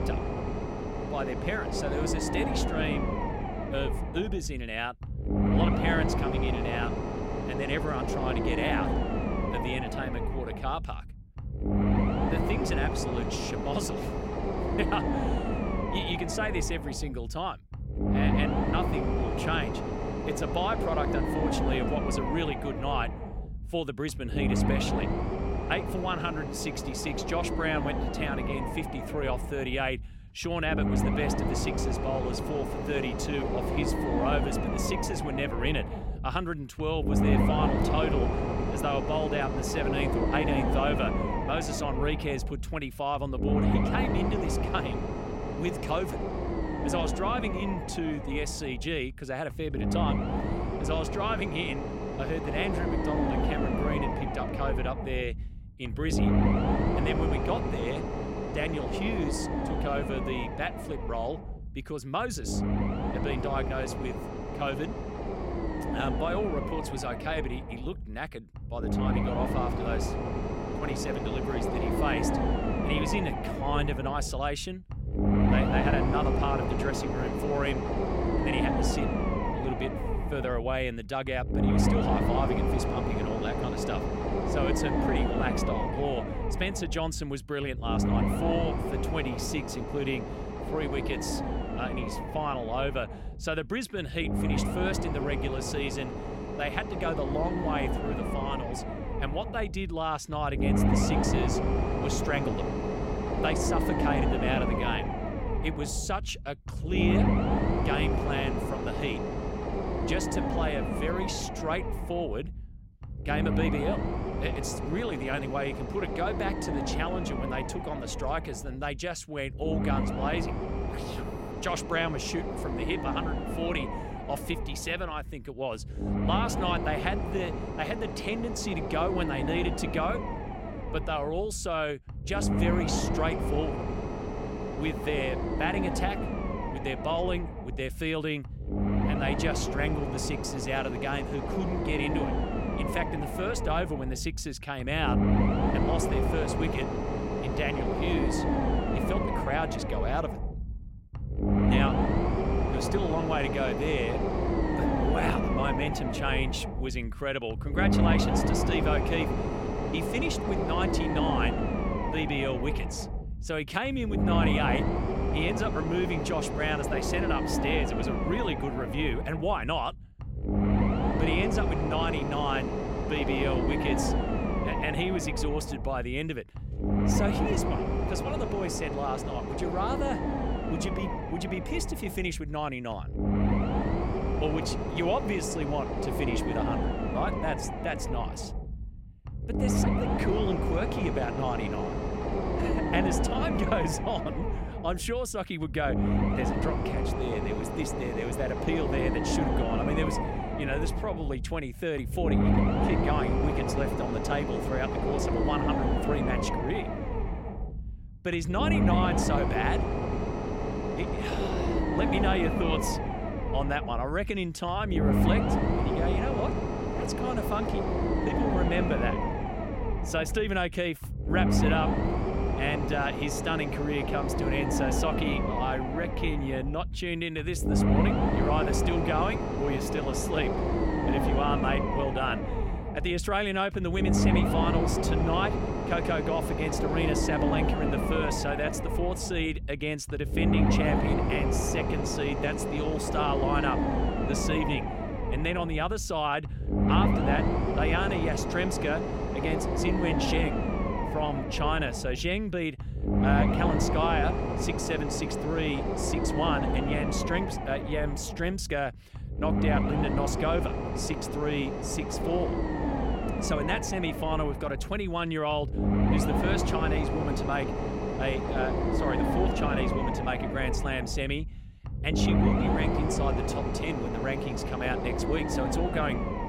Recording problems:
low rumble; loud; throughout; 1 dB below the speech

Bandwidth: 16.5 kHz